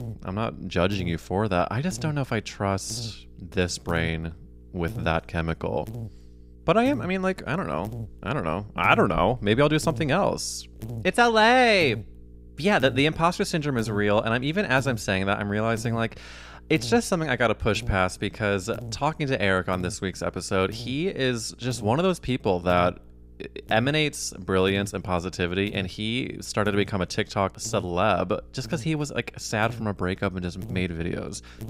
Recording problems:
electrical hum; faint; throughout; 60 Hz, 25 dB below the speech

